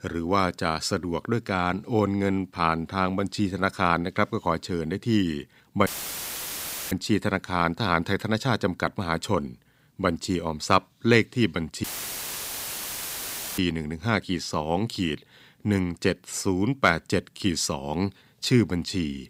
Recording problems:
audio cutting out; filled with static; at 6 s for 1 s and at 12 s for 1.5 s

